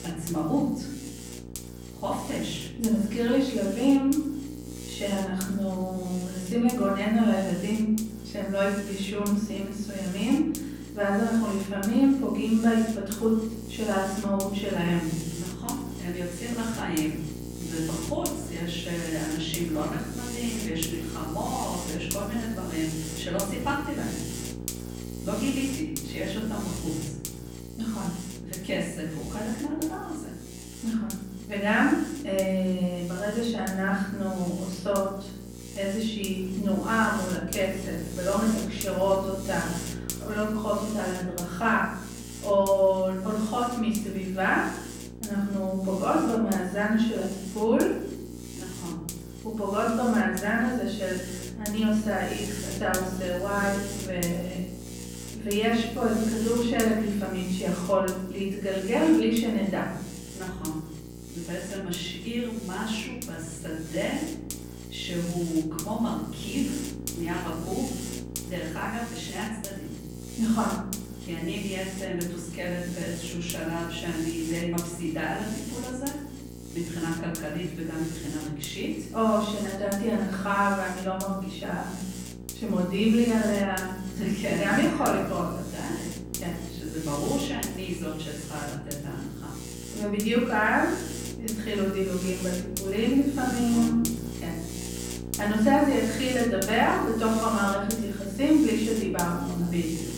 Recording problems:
off-mic speech; far
room echo; noticeable; dies away in 0.8 s
electrical hum; noticeable; throughout; 60 Hz, 10 dB below the speech

